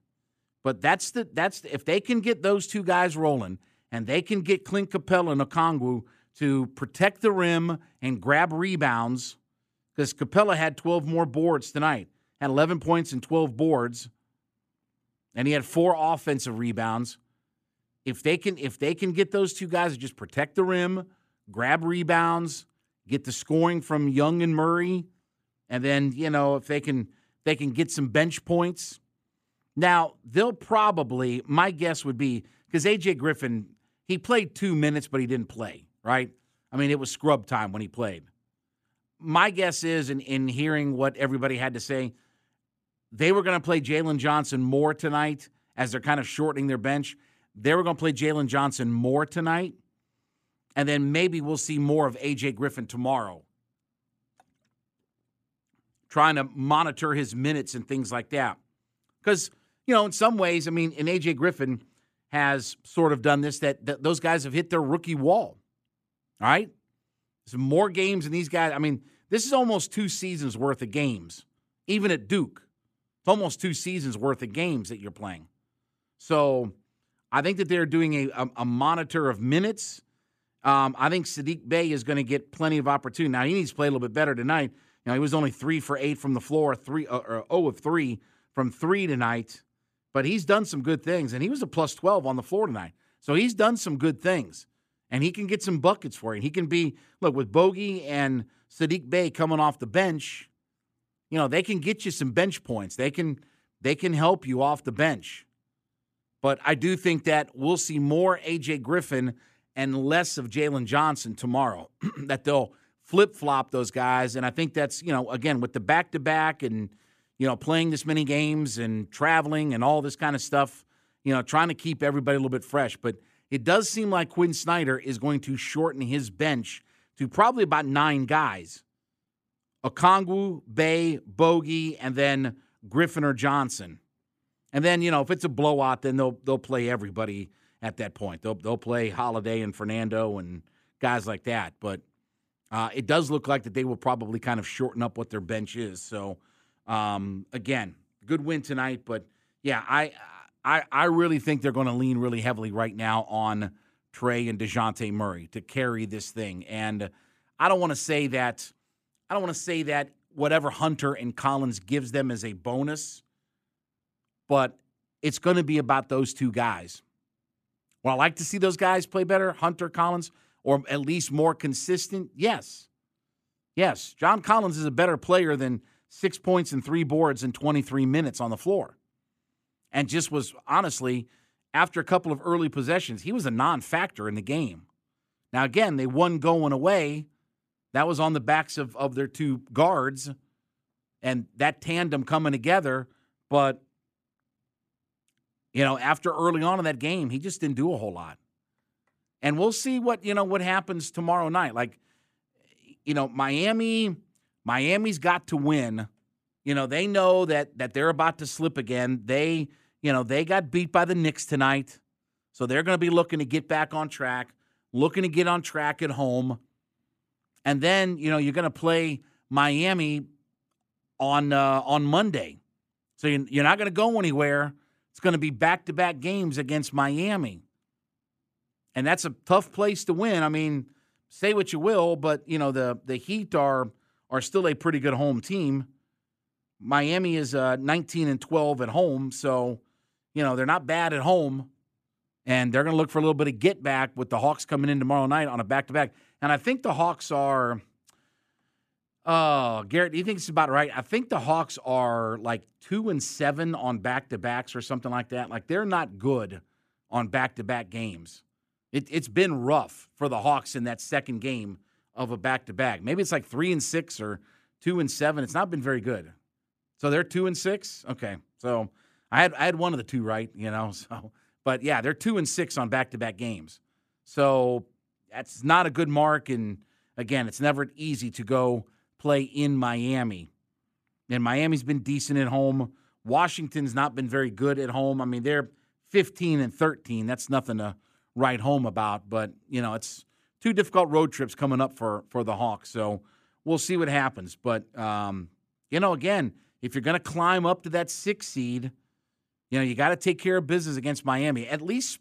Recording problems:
none

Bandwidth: 14.5 kHz